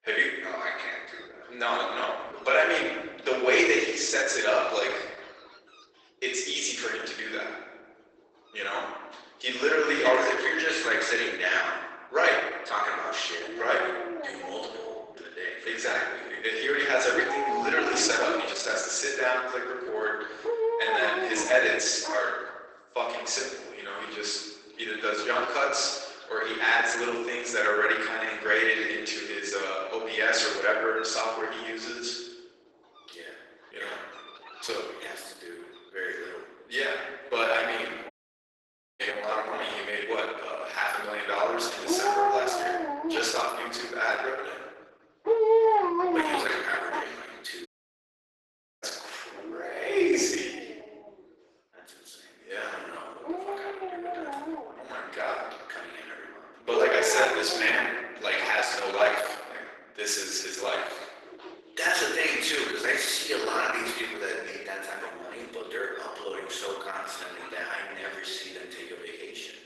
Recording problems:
off-mic speech; far
garbled, watery; badly; nothing above 8 kHz
thin; very; fading below 350 Hz
room echo; noticeable; dies away in 1.1 s
animal sounds; loud; throughout; 4 dB below the speech
audio cutting out; at 38 s for 1 s and at 48 s for 1 s

